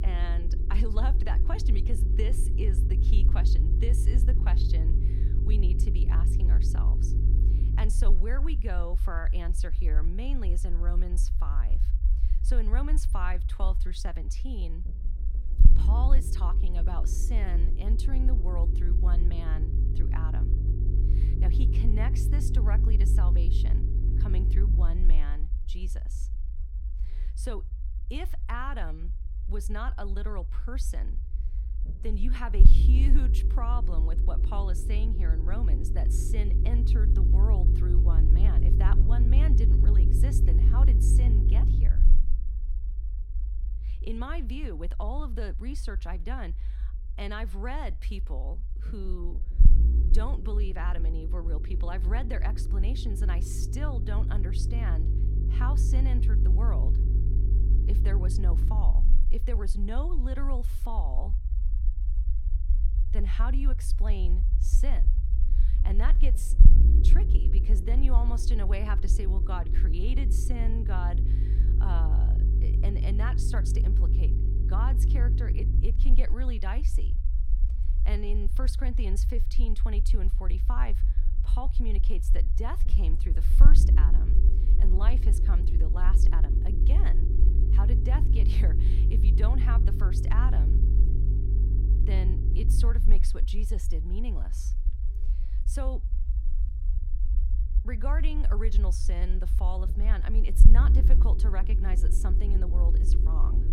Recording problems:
low rumble; loud; throughout; 4 dB below the speech

